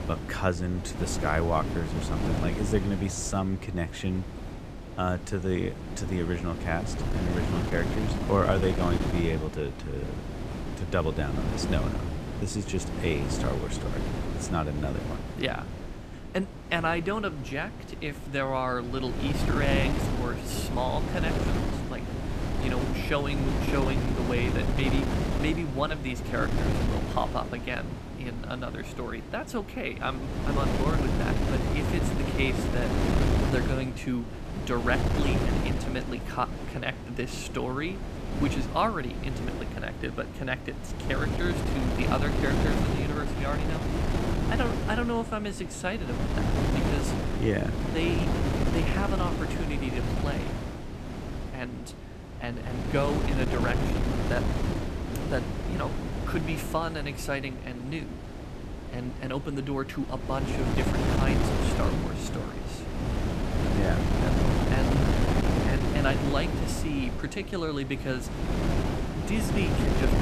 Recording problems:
wind noise on the microphone; heavy; 2 dB below the speech

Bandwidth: 14.5 kHz